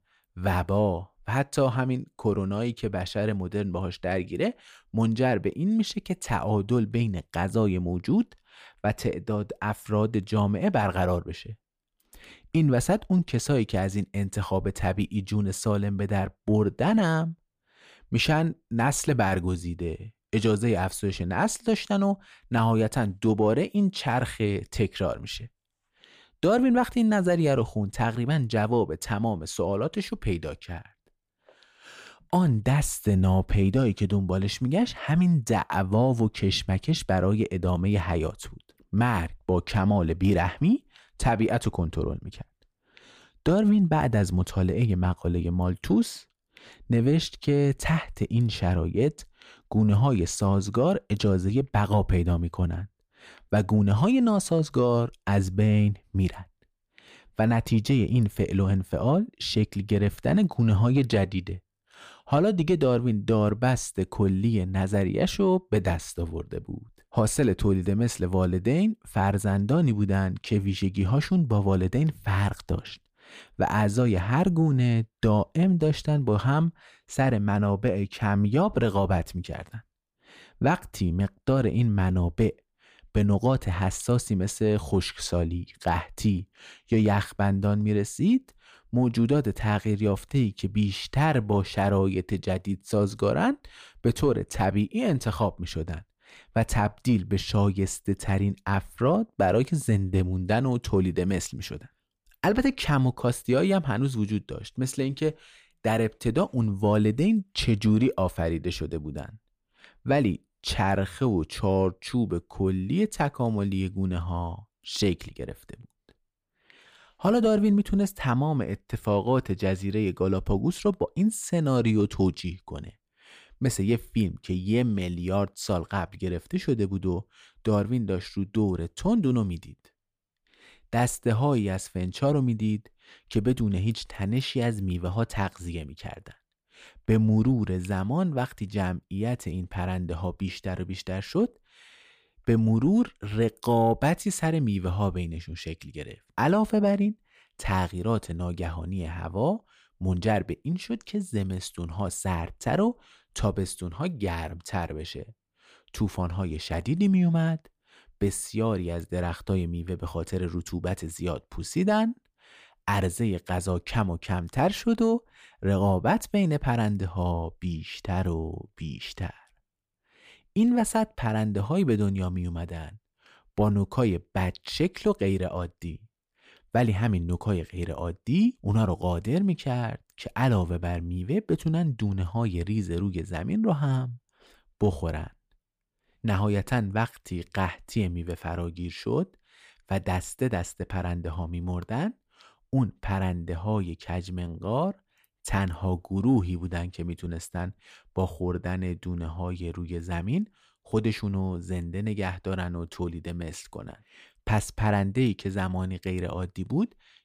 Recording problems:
none

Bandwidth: 15 kHz